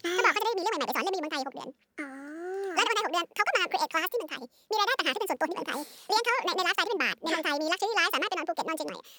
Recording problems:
wrong speed and pitch; too fast and too high; 1.7 times normal speed

